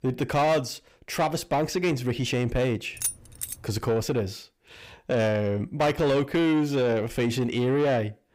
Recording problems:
distortion; slight; 10 dB below the speech
jangling keys; noticeable; at 3 s; peak 4 dB below the speech

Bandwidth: 15.5 kHz